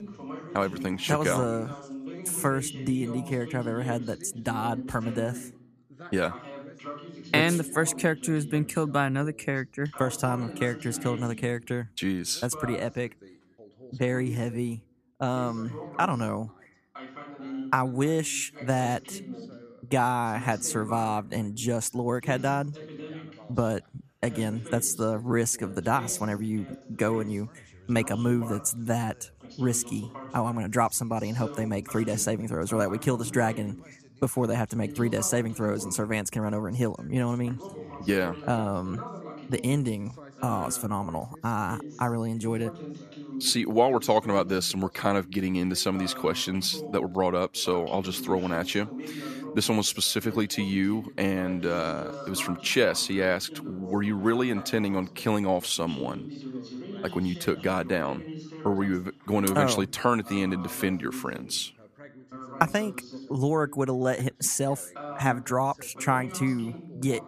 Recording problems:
background chatter; noticeable; throughout; 2 voices, 15 dB below the speech

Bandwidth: 14.5 kHz